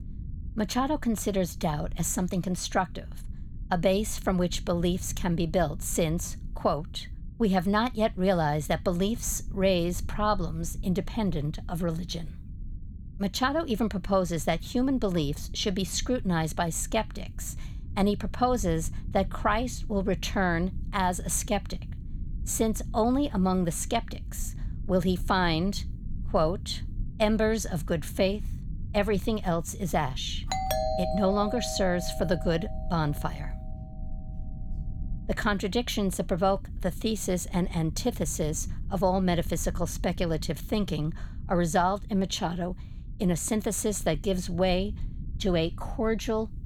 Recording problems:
low rumble; faint; throughout; 25 dB below the speech
doorbell; noticeable; from 31 to 33 s; peak 1 dB below the speech

